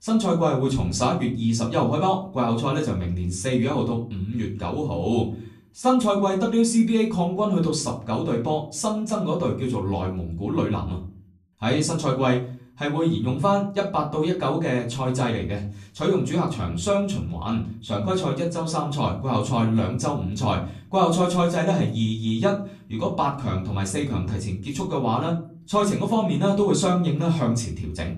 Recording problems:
off-mic speech; far
room echo; very slight; dies away in 0.4 s

